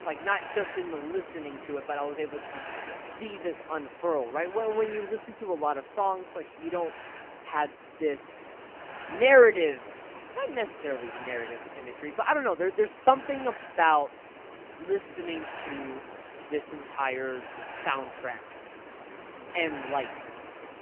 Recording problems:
phone-call audio; poor line; nothing above 3 kHz
hiss; noticeable; throughout; 15 dB below the speech

